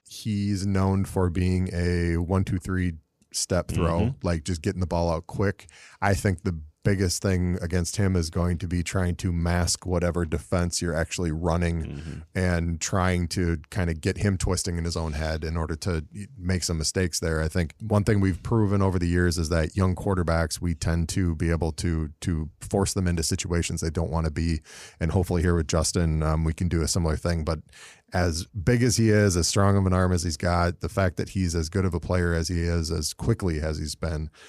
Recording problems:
none

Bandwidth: 15 kHz